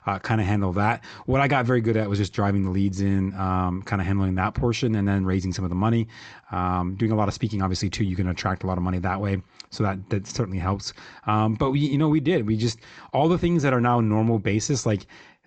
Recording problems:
high frequencies cut off; noticeable; nothing above 8 kHz

